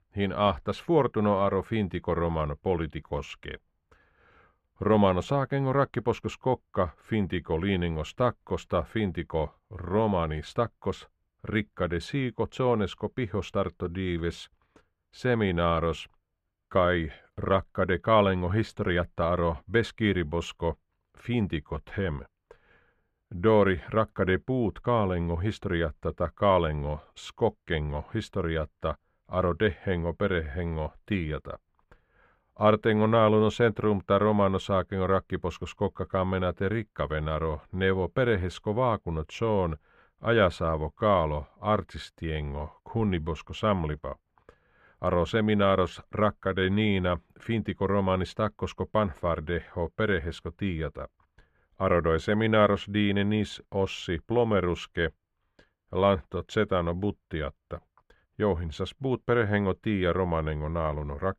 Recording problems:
muffled; slightly; fading above 3.5 kHz

